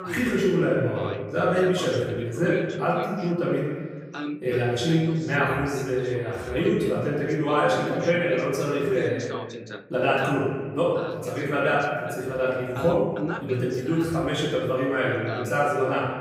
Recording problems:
off-mic speech; far
room echo; noticeable; dies away in 1.4 s
voice in the background; noticeable; throughout; 10 dB below the speech

